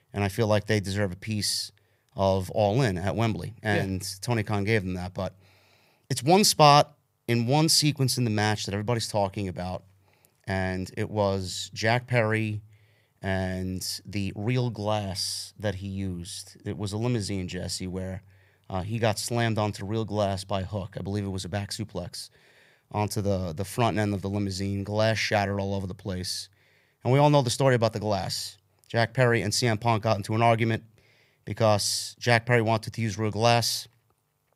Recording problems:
none

